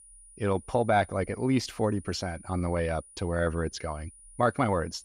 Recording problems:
high-pitched whine; faint; throughout; 9.5 kHz, 20 dB below the speech

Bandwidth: 15.5 kHz